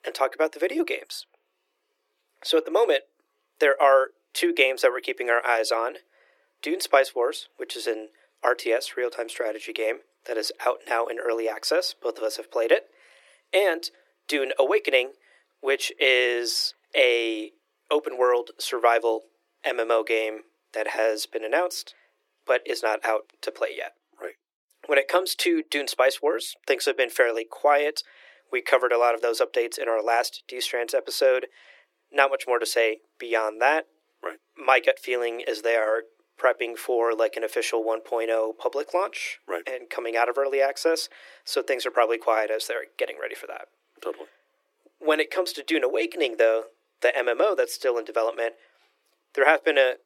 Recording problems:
thin; very; fading below 300 Hz

